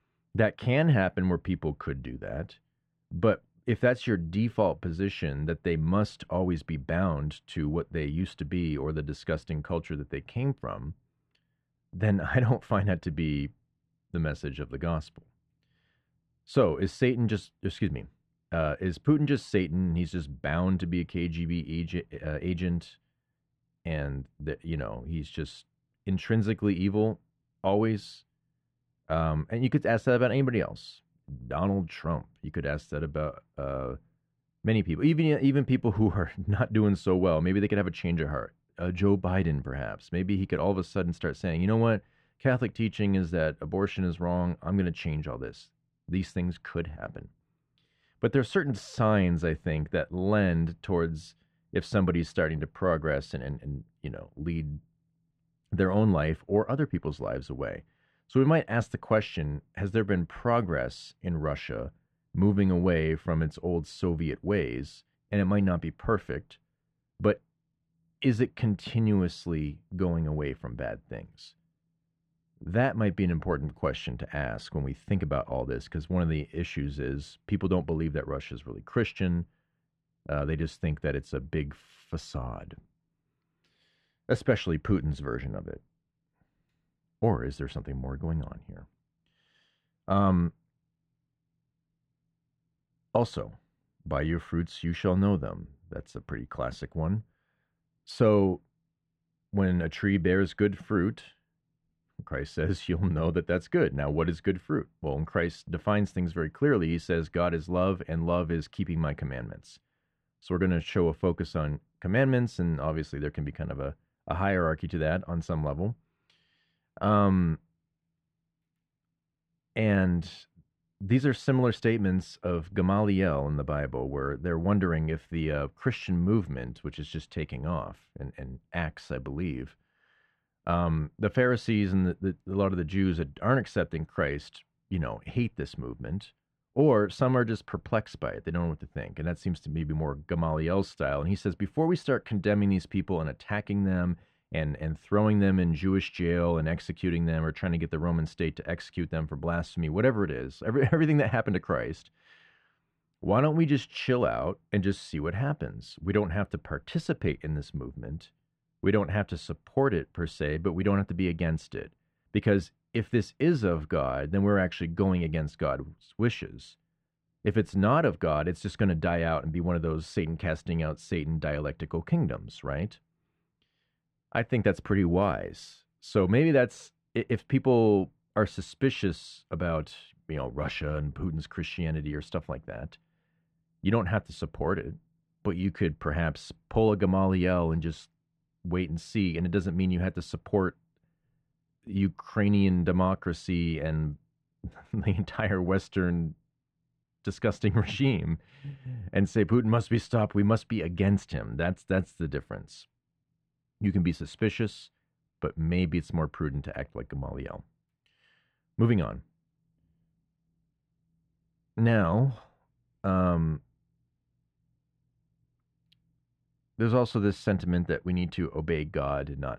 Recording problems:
muffled; very; fading above 2 kHz

